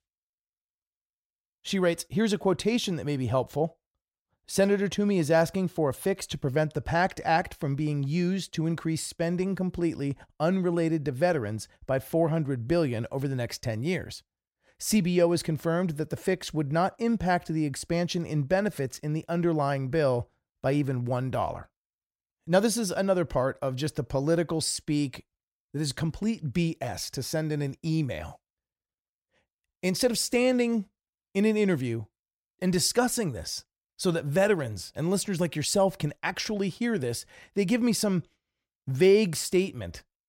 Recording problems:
none

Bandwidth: 16 kHz